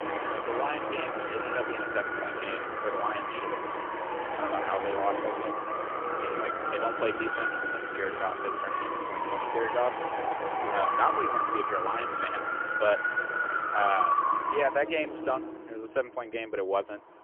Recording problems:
phone-call audio; poor line; nothing above 3 kHz
traffic noise; very loud; throughout; 1 dB above the speech

